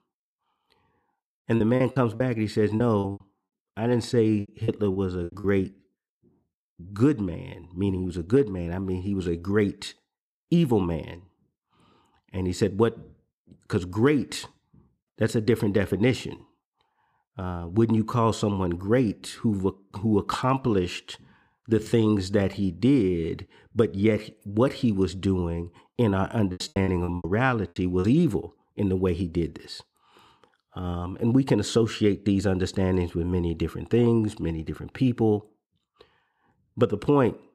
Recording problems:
choppy; very; from 1.5 to 5.5 s and from 27 to 28 s; 18% of the speech affected

